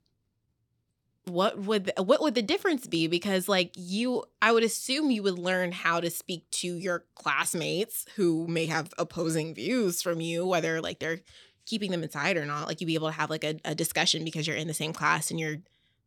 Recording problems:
none

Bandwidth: 18 kHz